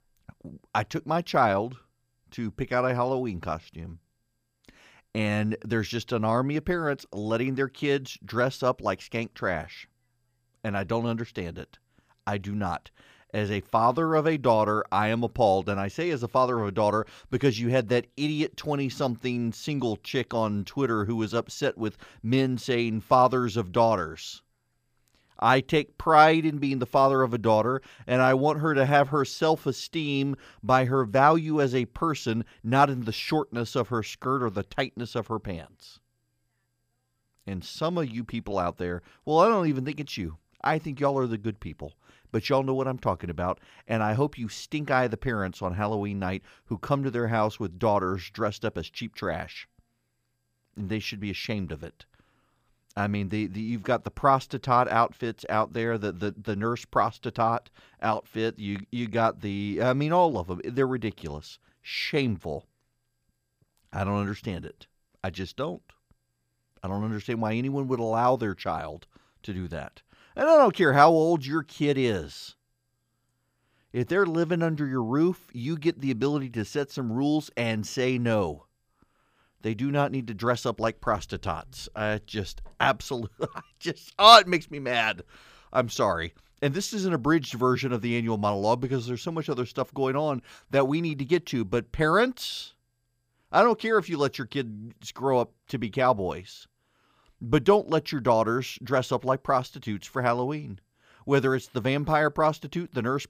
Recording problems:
none

